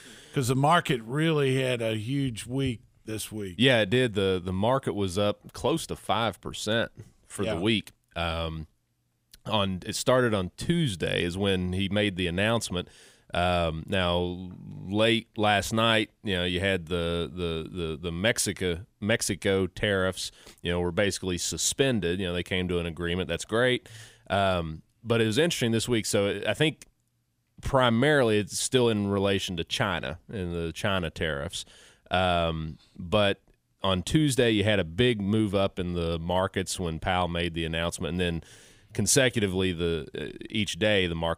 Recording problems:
none

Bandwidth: 15.5 kHz